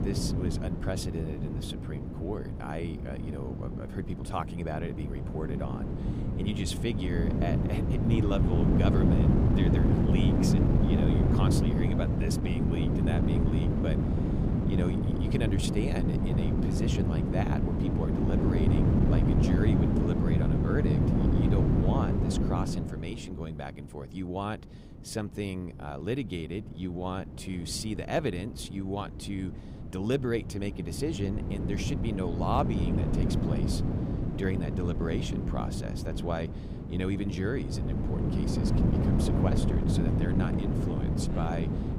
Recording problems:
wind noise on the microphone; heavy; 1 dB above the speech

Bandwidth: 15.5 kHz